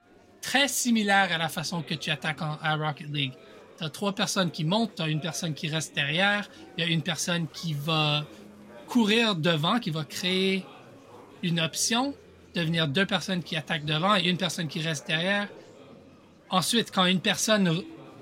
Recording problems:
murmuring crowd; faint; throughout; 25 dB below the speech

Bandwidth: 16 kHz